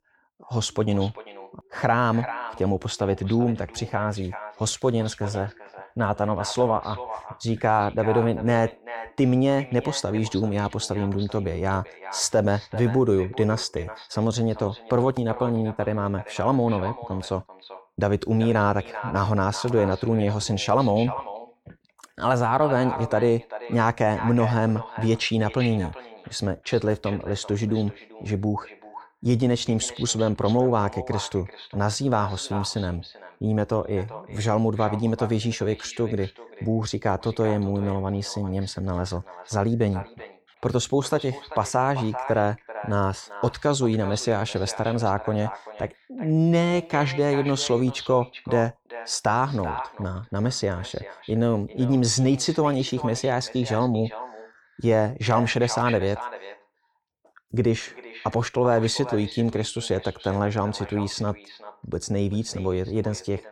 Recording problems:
echo of what is said; noticeable; throughout; 390 ms later, 15 dB below the speech

